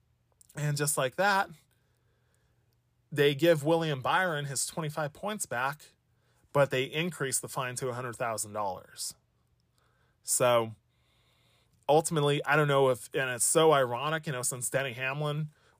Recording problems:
none

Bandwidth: 15 kHz